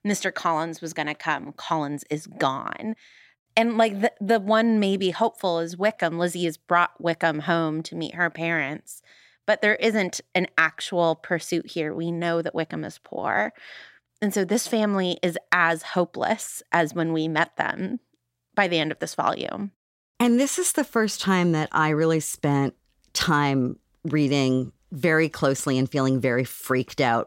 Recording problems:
none

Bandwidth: 16 kHz